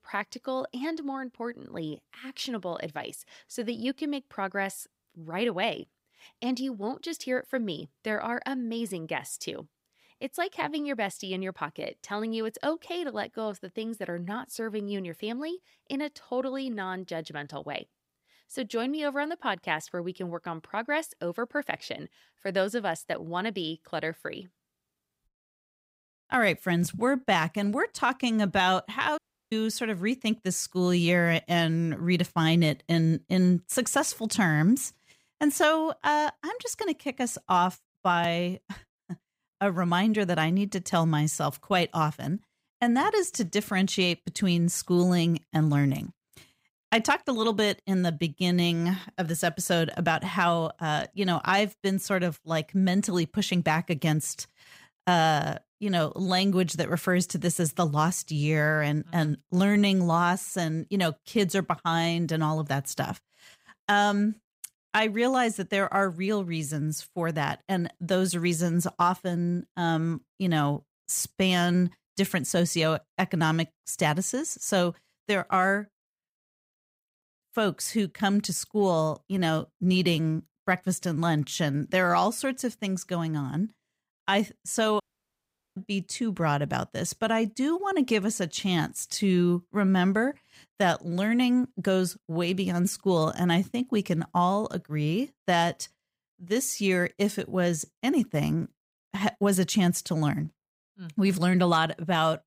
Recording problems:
audio cutting out; at 29 s and at 1:25 for 1 s

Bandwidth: 15.5 kHz